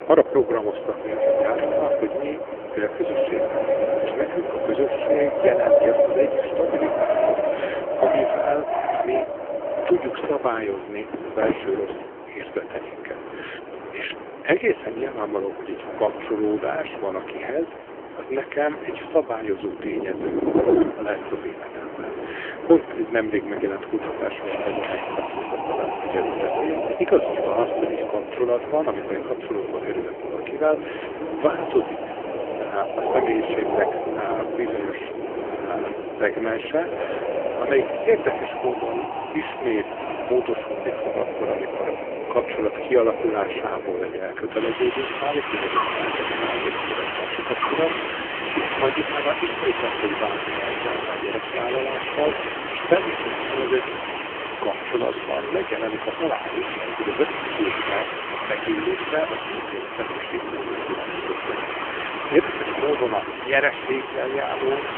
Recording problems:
phone-call audio; poor line; nothing above 3 kHz
wind in the background; loud; throughout; 1 dB below the speech

